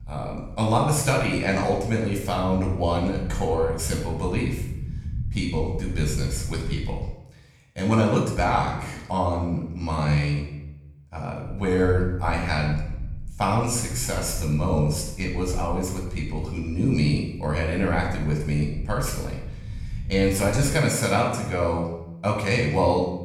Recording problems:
off-mic speech; far
room echo; noticeable; dies away in 0.7 s
low rumble; faint; until 7 s and from 11 to 21 s; 25 dB below the speech

